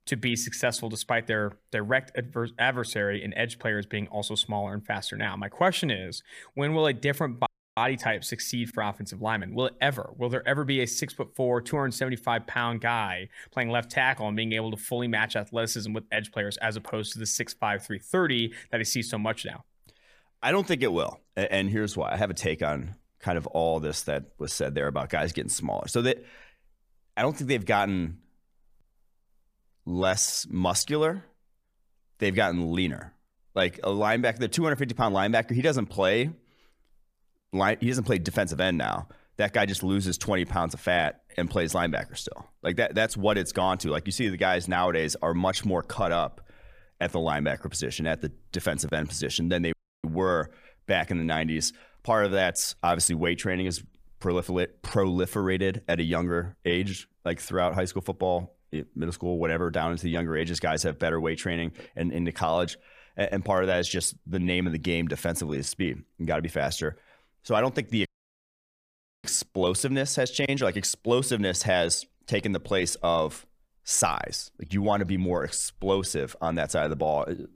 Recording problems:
audio cutting out; at 7.5 s, at 50 s and at 1:08 for 1 s

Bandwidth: 15 kHz